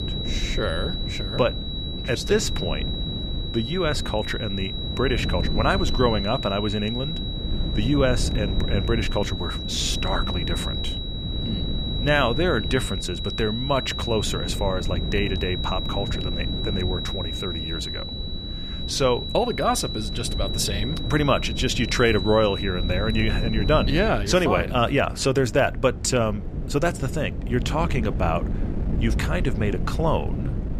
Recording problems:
high-pitched whine; loud; until 24 s; 4 kHz, 6 dB below the speech
wind noise on the microphone; occasional gusts; 15 dB below the speech

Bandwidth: 14.5 kHz